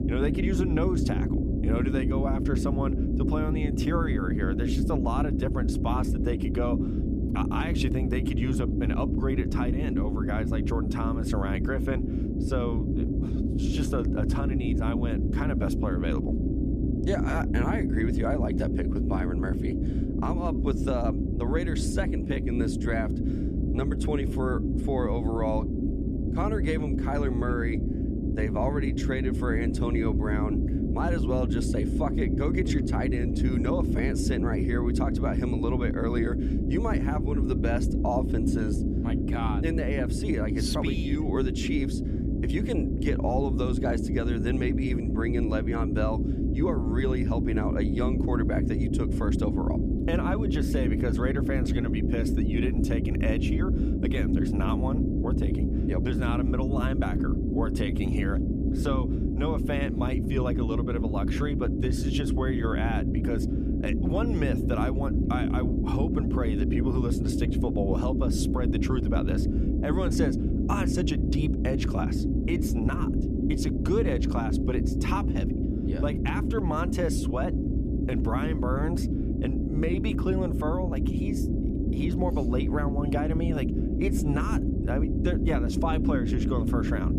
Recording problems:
low rumble; loud; throughout; 1 dB below the speech

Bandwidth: 14.5 kHz